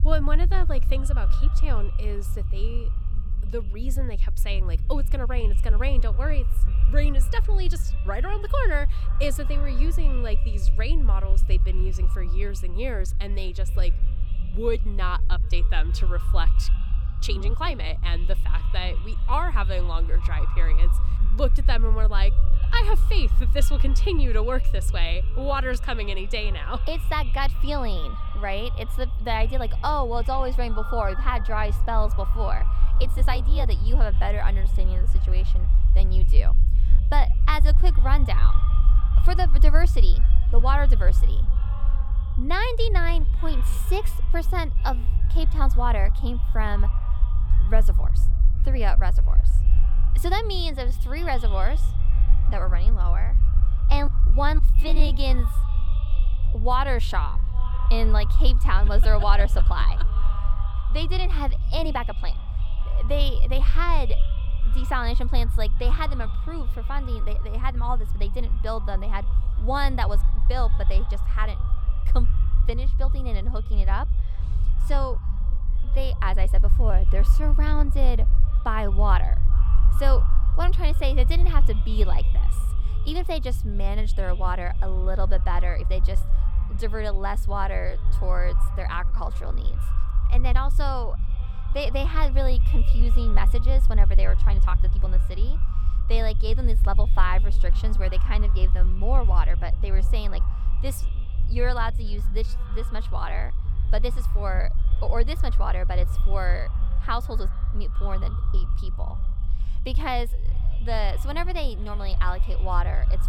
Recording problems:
echo of what is said; noticeable; throughout; 410 ms later, 15 dB below the speech
low rumble; noticeable; throughout; 15 dB below the speech
uneven, jittery; strongly; from 17 s to 1:35
phone ringing; noticeable; from 30 to 32 s; peak 7 dB below the speech

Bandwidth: 18 kHz